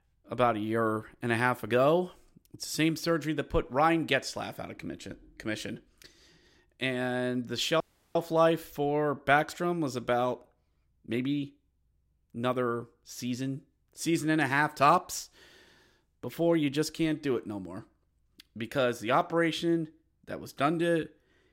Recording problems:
audio cutting out; at 8 s

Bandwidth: 16 kHz